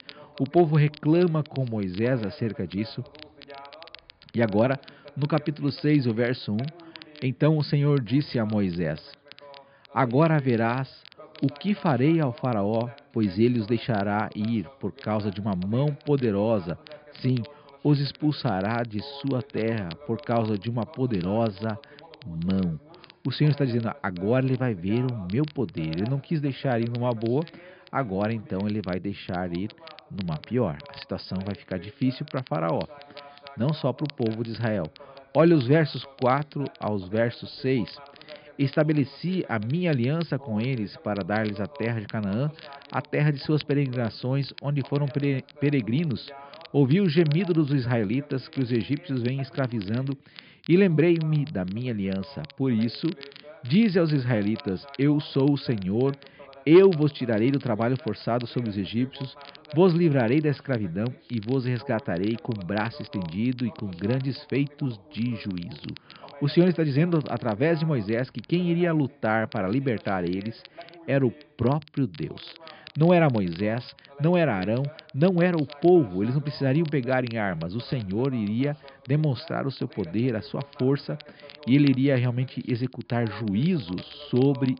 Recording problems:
high frequencies cut off; noticeable; nothing above 5 kHz
voice in the background; faint; throughout; 25 dB below the speech
crackle, like an old record; faint; 25 dB below the speech

